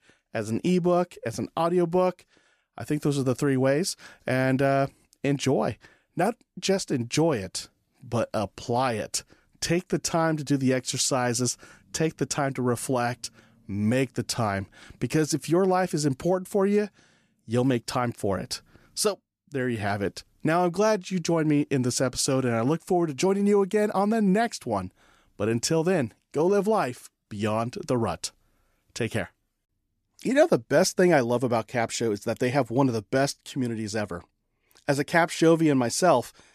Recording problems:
none

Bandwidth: 14.5 kHz